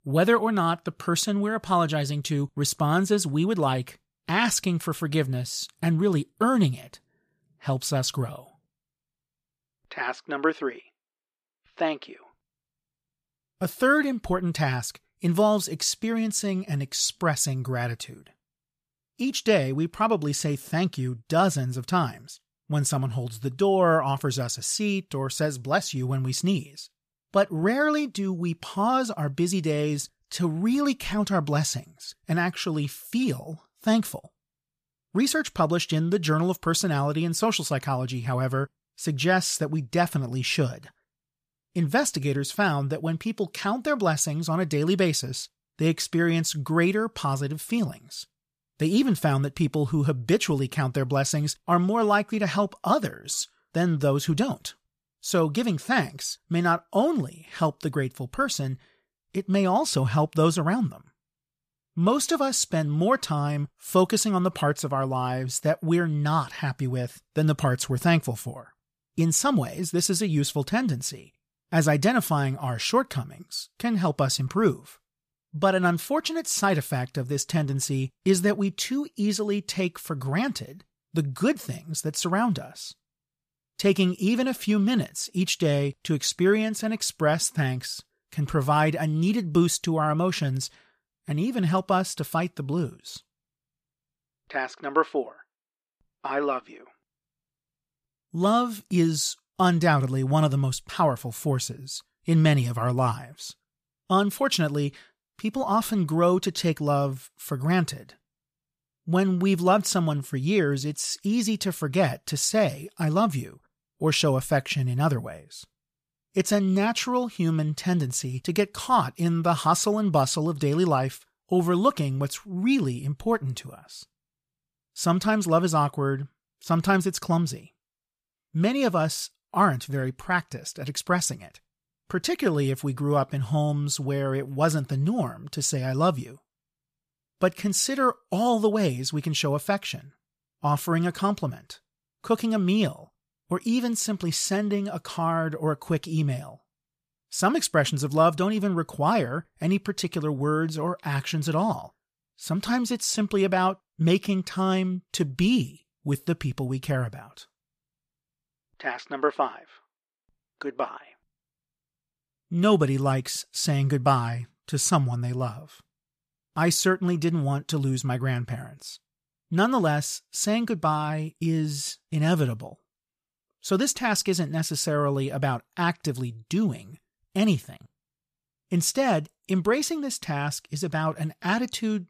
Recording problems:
none

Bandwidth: 14.5 kHz